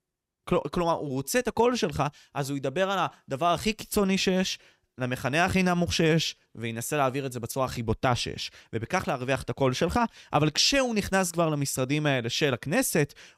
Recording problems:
none

